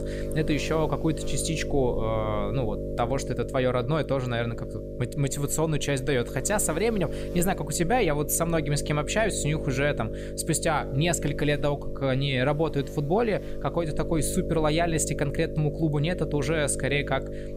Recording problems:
electrical hum; loud; throughout; 50 Hz, 9 dB below the speech

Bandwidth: 15.5 kHz